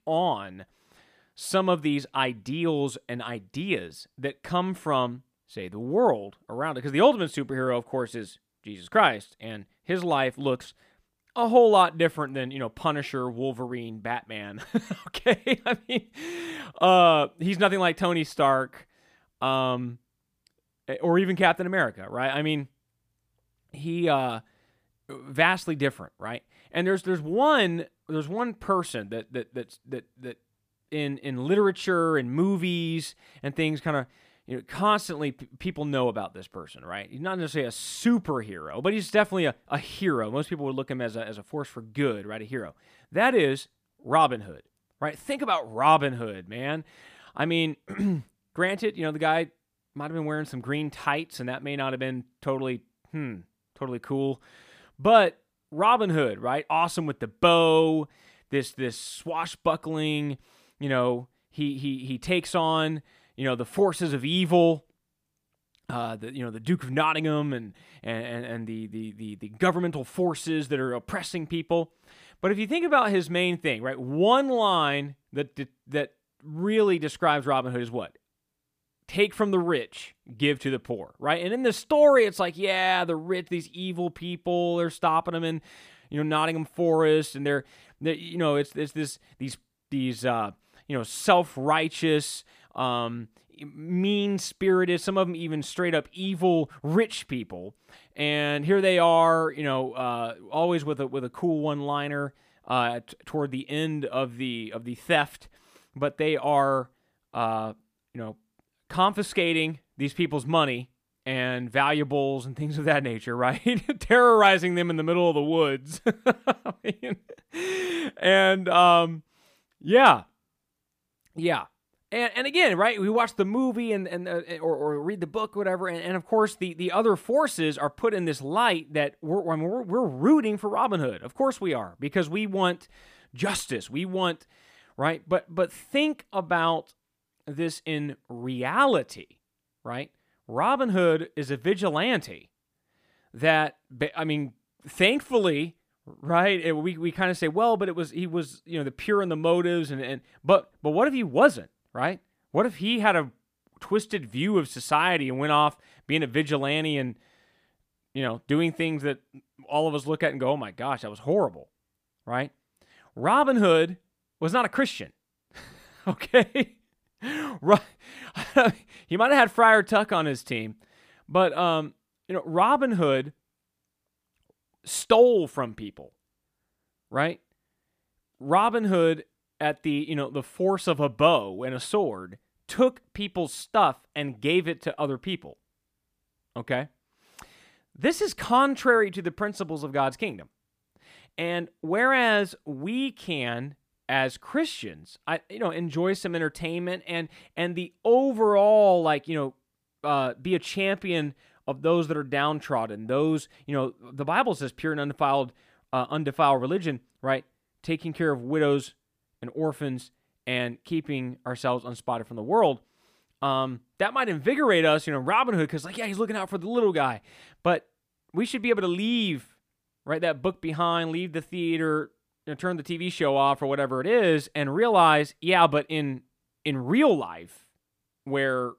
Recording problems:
none

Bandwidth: 15 kHz